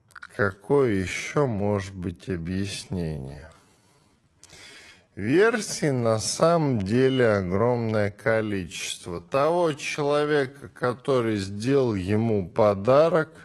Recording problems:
wrong speed, natural pitch; too slow; 0.5 times normal speed
garbled, watery; slightly; nothing above 11 kHz

